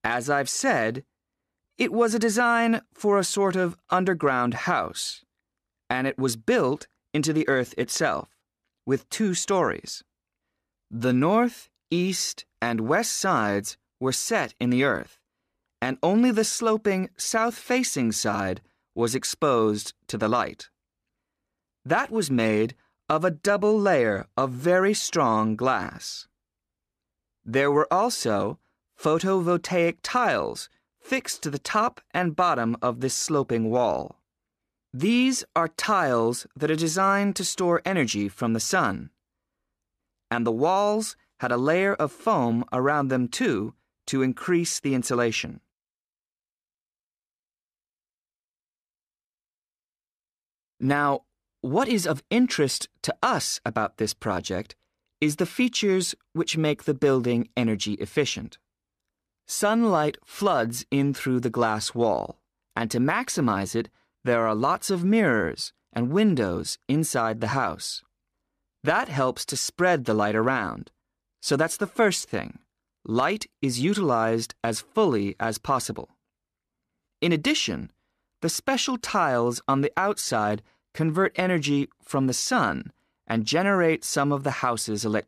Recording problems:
none

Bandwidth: 14.5 kHz